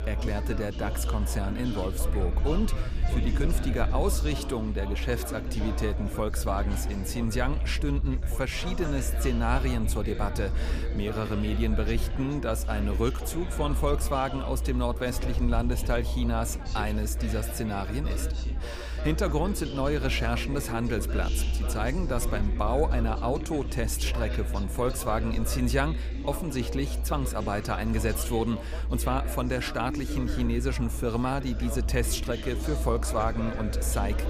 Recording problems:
chatter from many people; loud; throughout; 9 dB below the speech
low rumble; faint; throughout; 20 dB below the speech

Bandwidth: 15 kHz